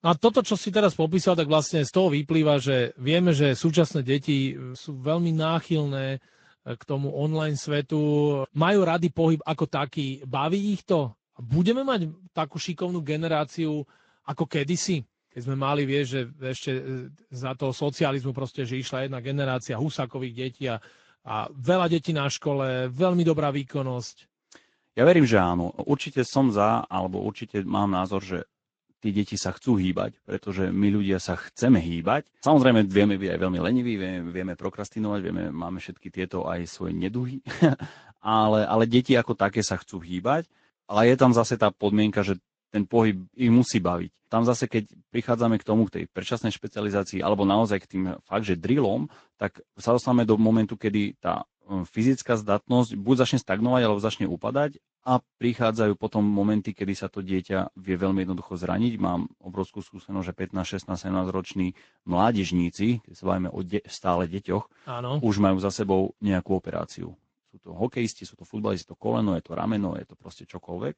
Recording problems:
garbled, watery; slightly; nothing above 7.5 kHz

